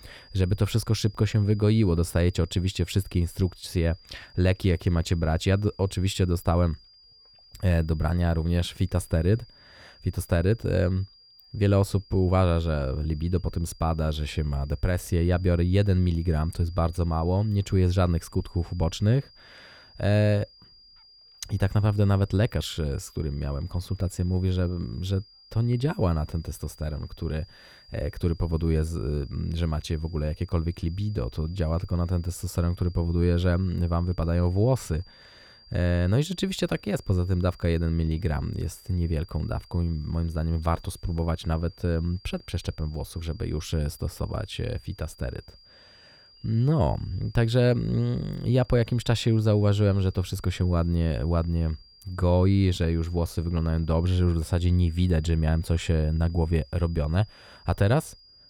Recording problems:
high-pitched whine; faint; throughout; 5 kHz, 25 dB below the speech

